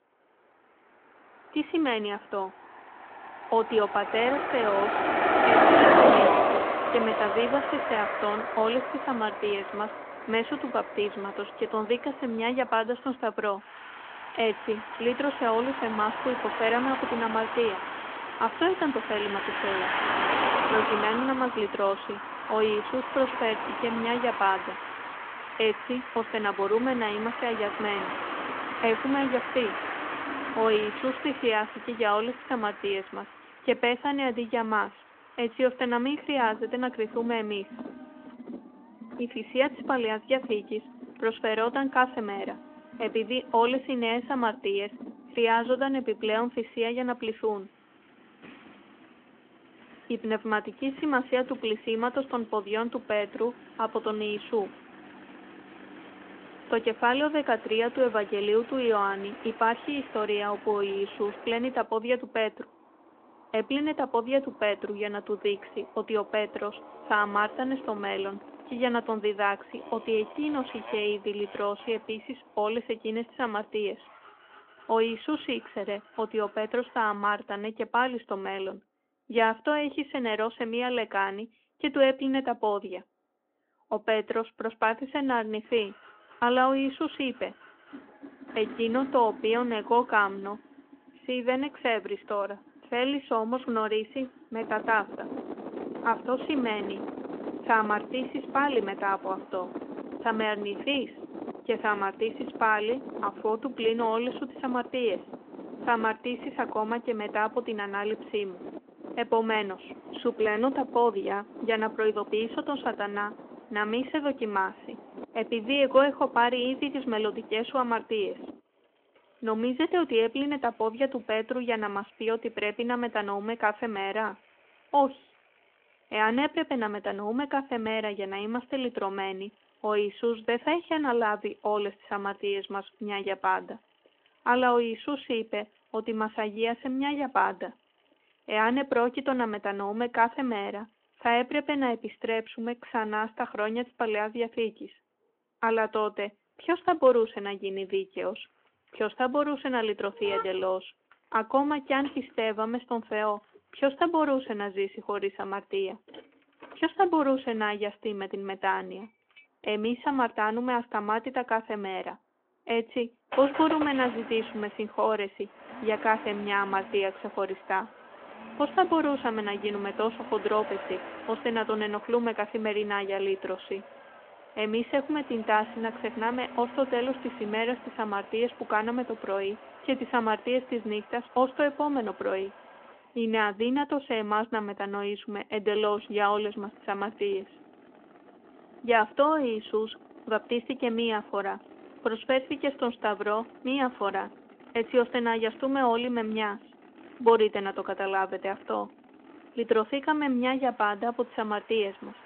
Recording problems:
phone-call audio
traffic noise; loud; throughout; 4 dB below the speech

